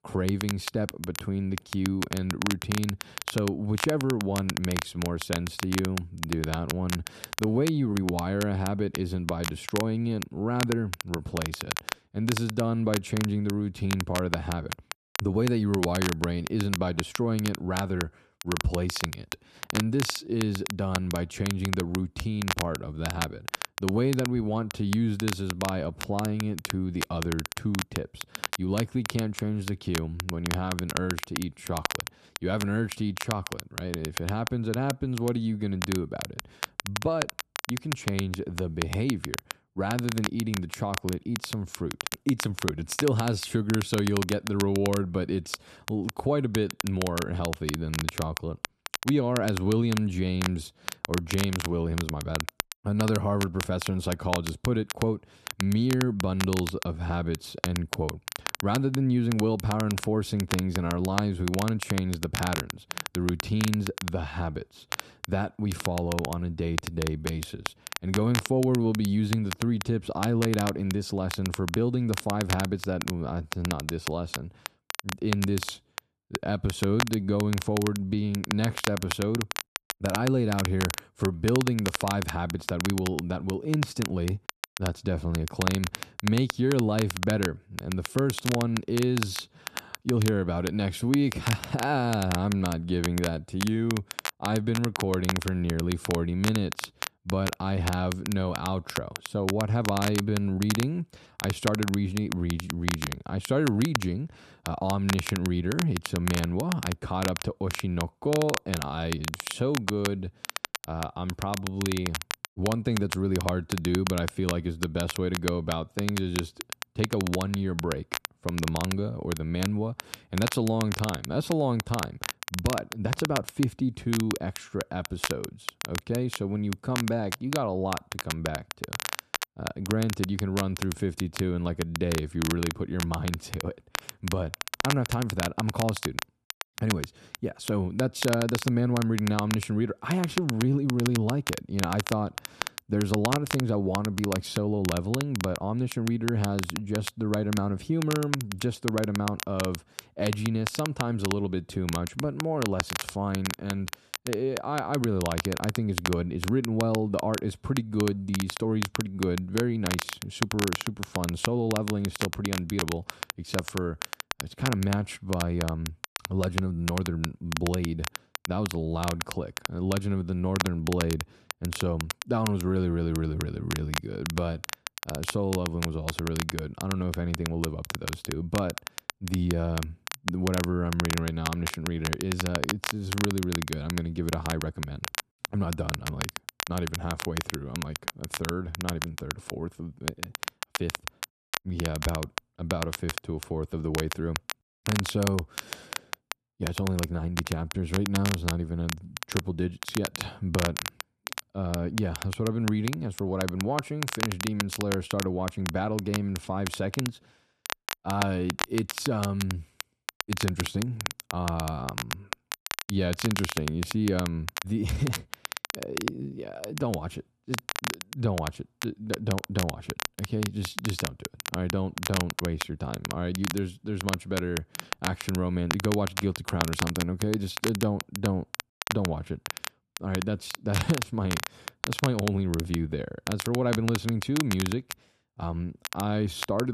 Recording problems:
crackle, like an old record; loud; 6 dB below the speech
abrupt cut into speech; at the end

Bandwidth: 13.5 kHz